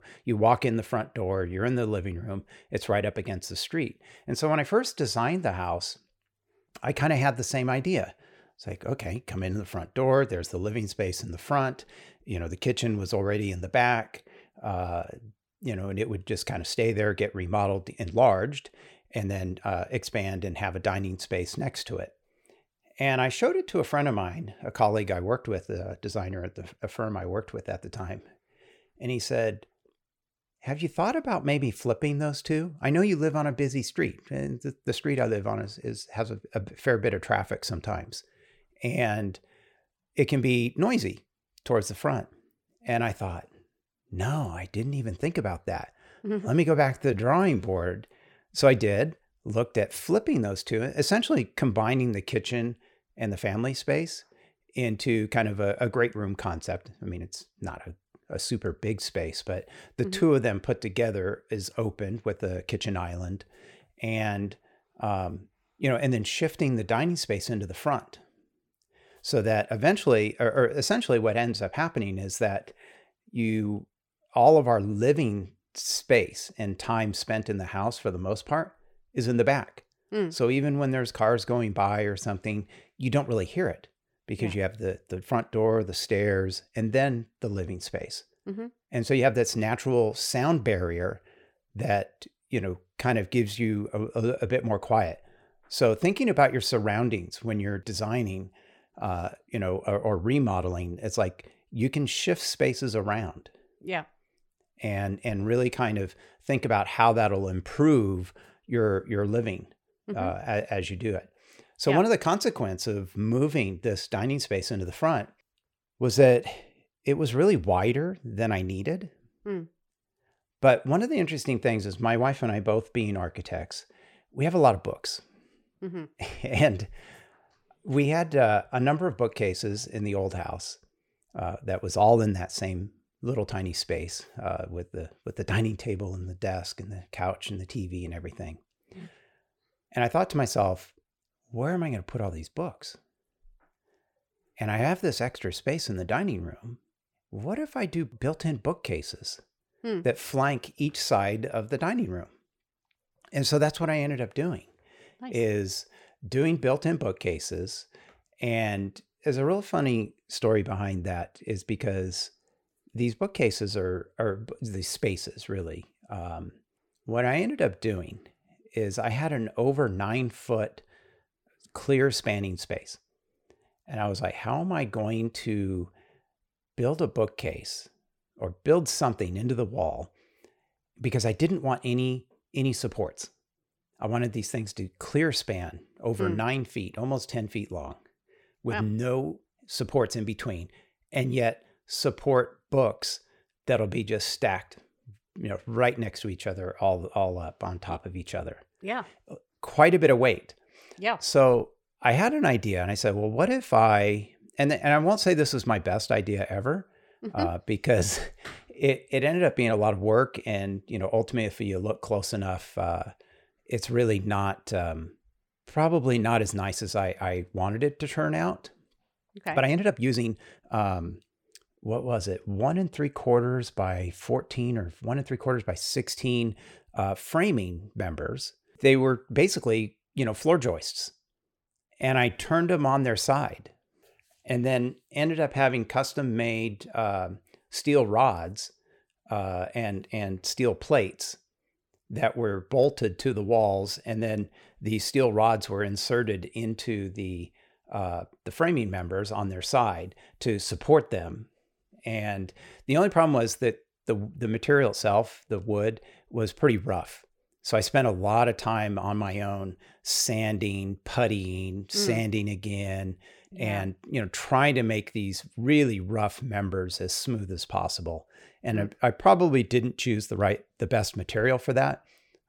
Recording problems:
uneven, jittery; strongly; from 47 s to 3:53

